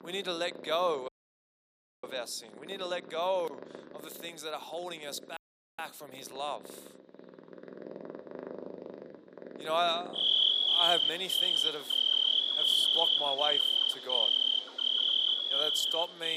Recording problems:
thin; very; fading below 300 Hz
animal sounds; very loud; throughout; 10 dB above the speech
audio cutting out; at 1 s for 1 s and at 5.5 s
abrupt cut into speech; at the end

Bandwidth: 15 kHz